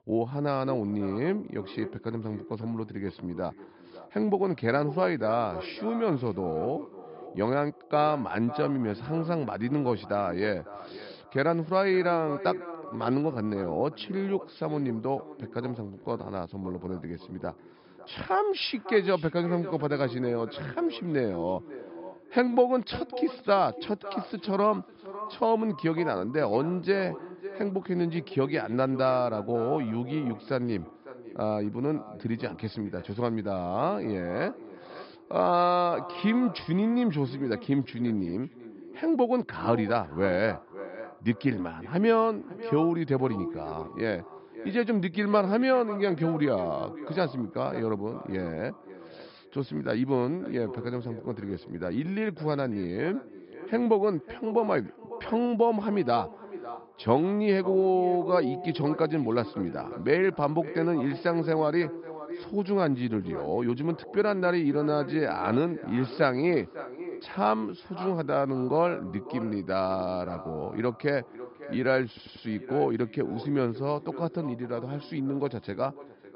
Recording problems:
echo of what is said; noticeable; throughout; 550 ms later, 15 dB below the speech
high frequencies cut off; noticeable; nothing above 5.5 kHz
audio stuttering; at 1:12

